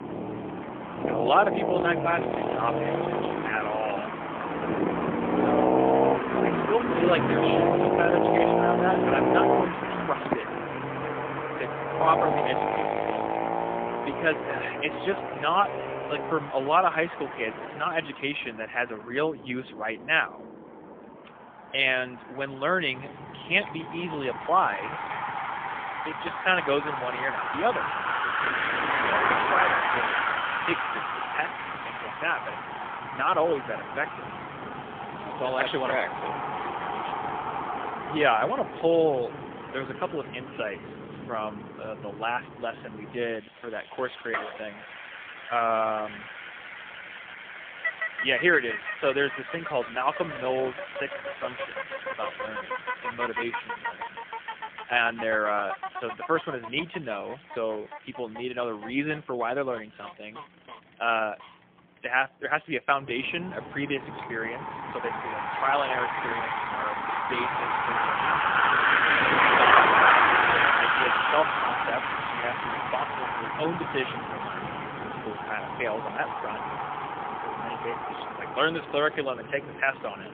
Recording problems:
phone-call audio; poor line; nothing above 3.5 kHz
traffic noise; very loud; throughout; 1 dB above the speech

